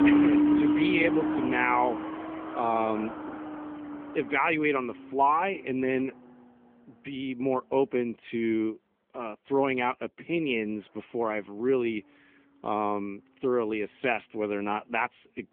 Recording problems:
phone-call audio
traffic noise; very loud; throughout; 1 dB above the speech

